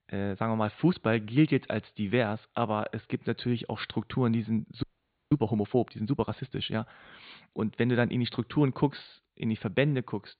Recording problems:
high frequencies cut off; severe; nothing above 4.5 kHz
audio freezing; at 5 s

